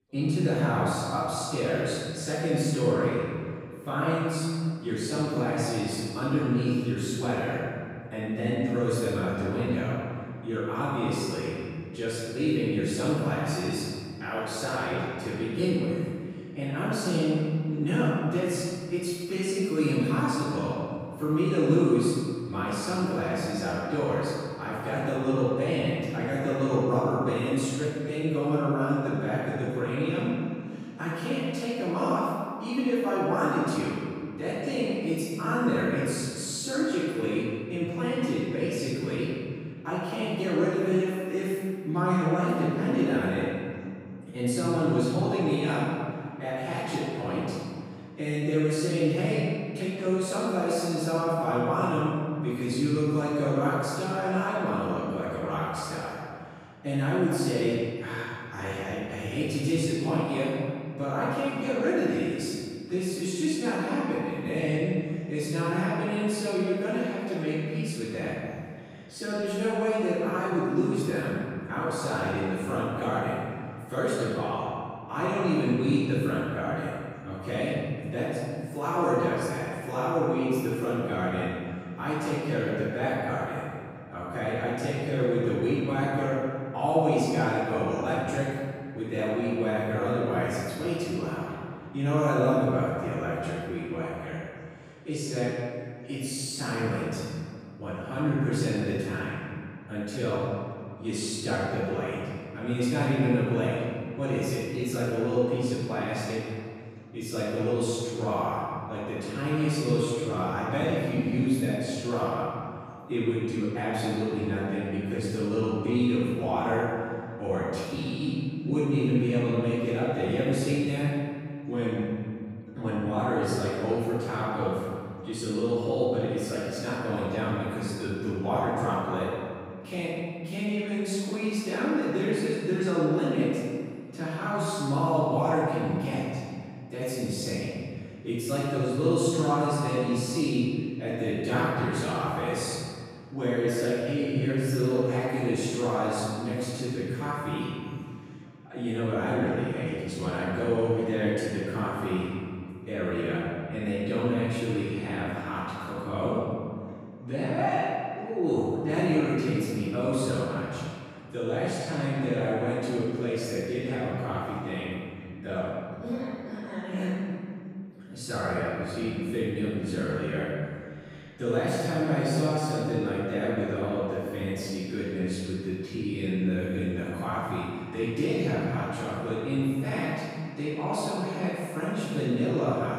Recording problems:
room echo; strong; dies away in 2 s
off-mic speech; far
background chatter; faint; throughout; 2 voices, 30 dB below the speech

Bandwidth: 15.5 kHz